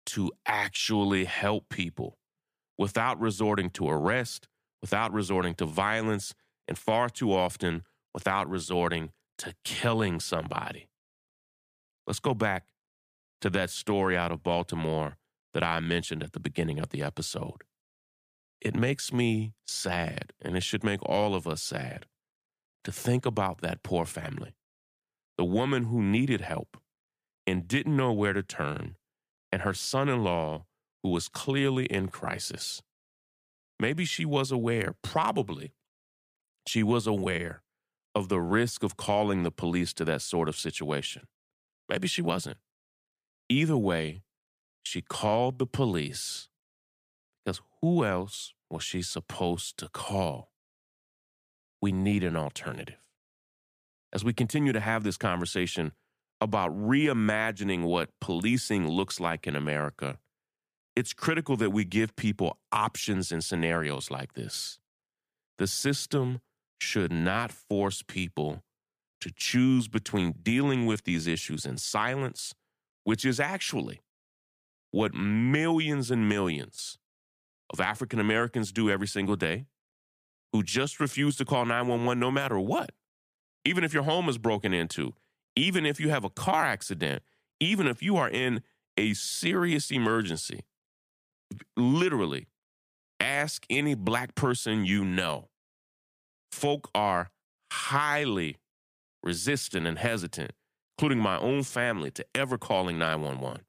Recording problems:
none

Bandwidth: 15 kHz